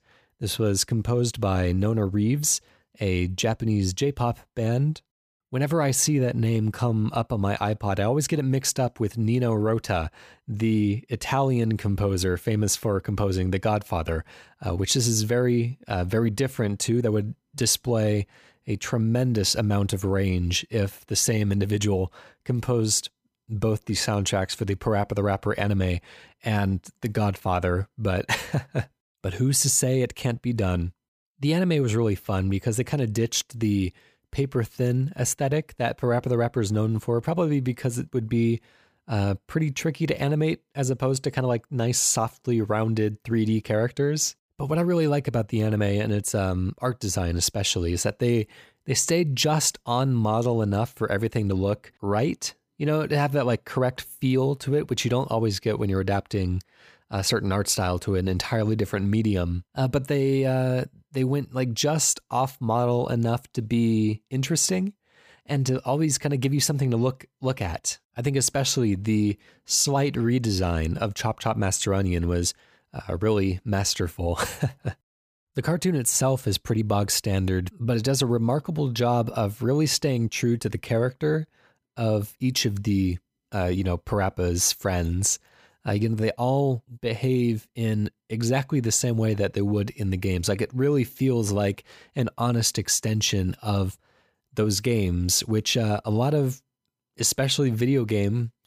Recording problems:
none

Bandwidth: 15 kHz